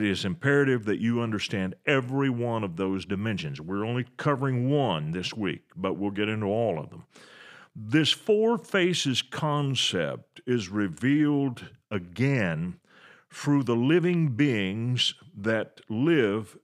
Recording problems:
abrupt cut into speech; at the start

